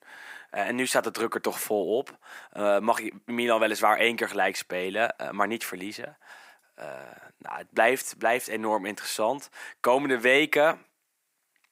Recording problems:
thin; somewhat; fading below 300 Hz

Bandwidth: 15.5 kHz